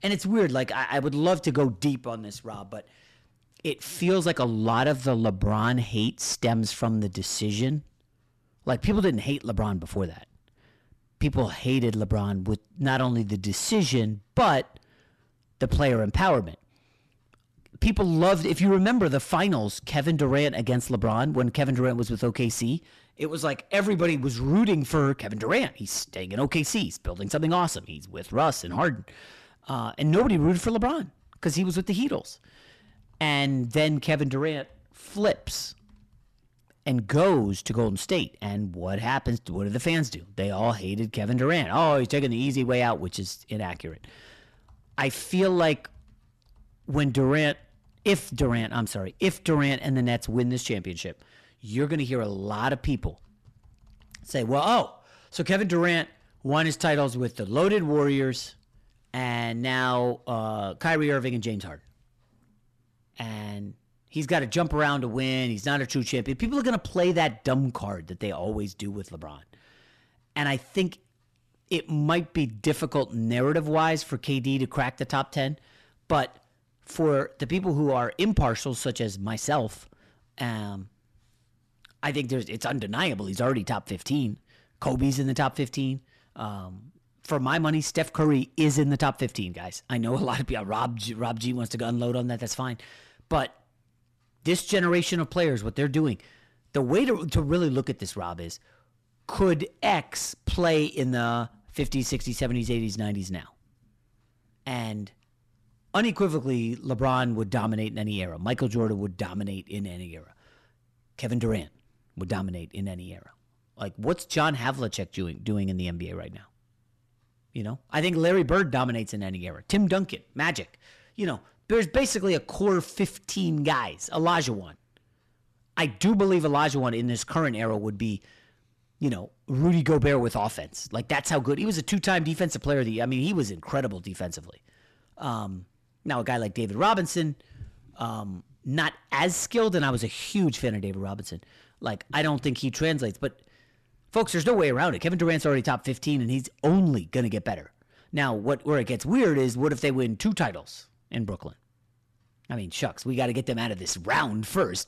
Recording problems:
distortion; slight; 10 dB below the speech

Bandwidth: 13.5 kHz